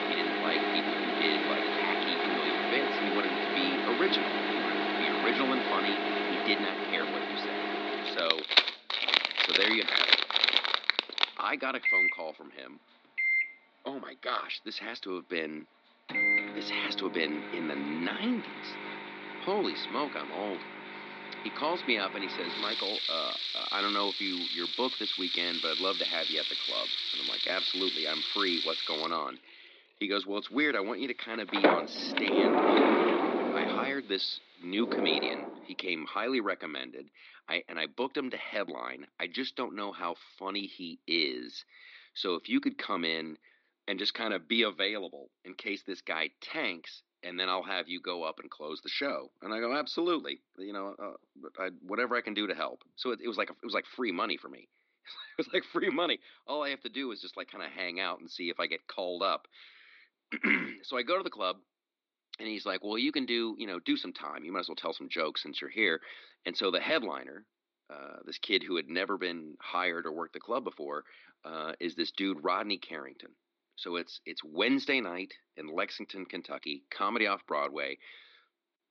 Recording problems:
thin; somewhat; fading below 250 Hz
muffled; very slightly; fading above 4 kHz
household noises; very loud; until 35 s; 4 dB above the speech

